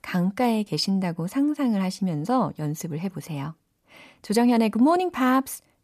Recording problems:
none

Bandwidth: 14.5 kHz